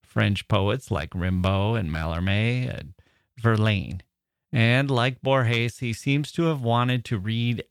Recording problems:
none

